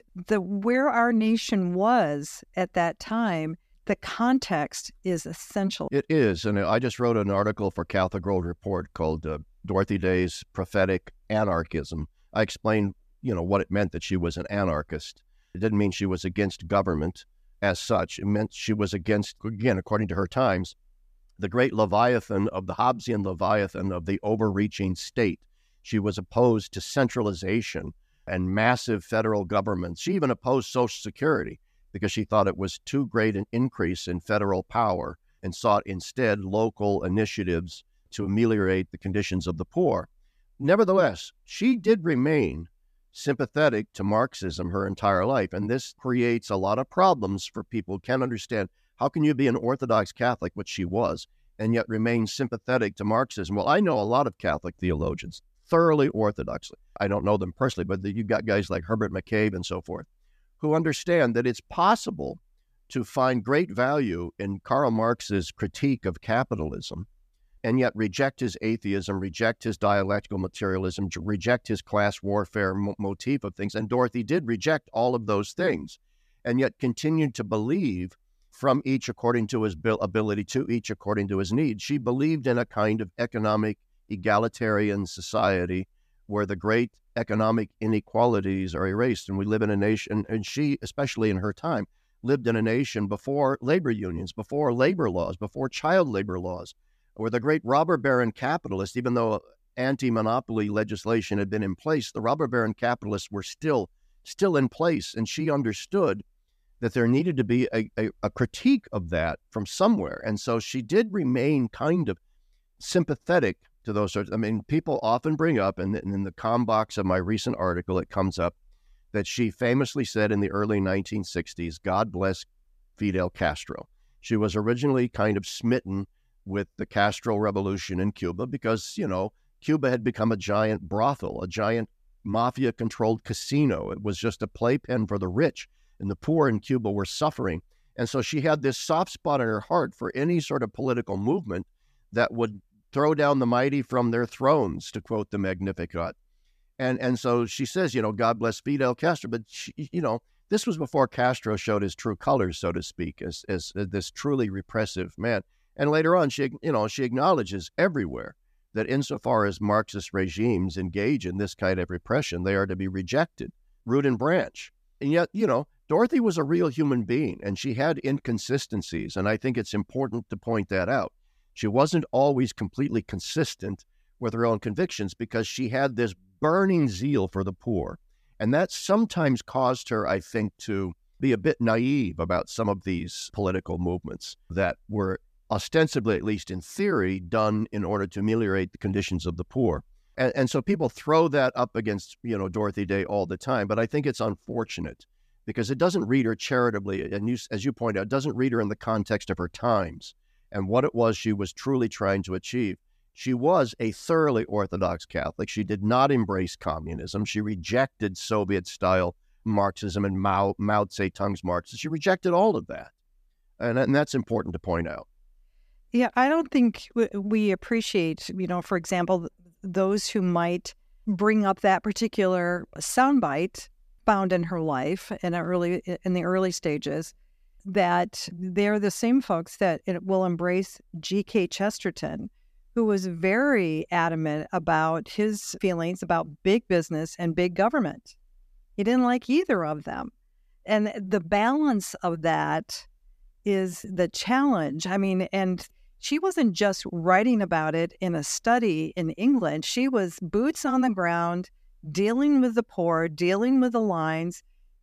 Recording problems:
none

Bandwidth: 14.5 kHz